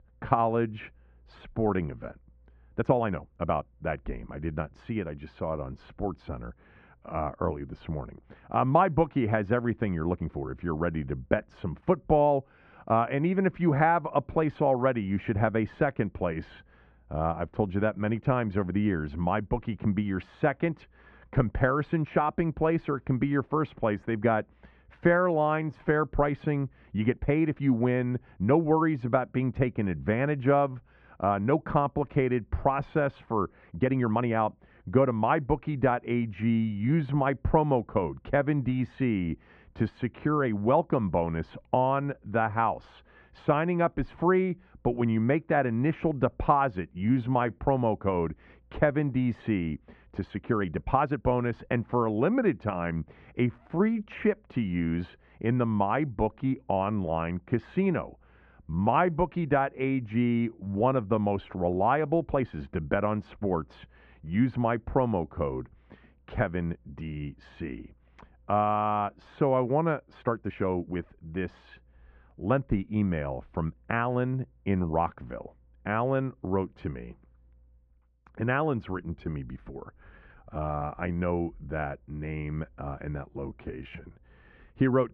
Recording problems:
muffled; very; fading above 1.5 kHz
uneven, jittery; strongly; from 1 s to 1:24

